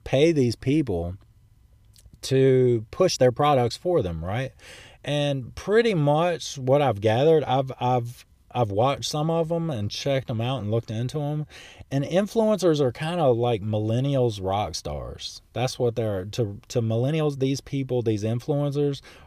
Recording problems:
uneven, jittery; strongly; from 2 to 17 s

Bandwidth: 15 kHz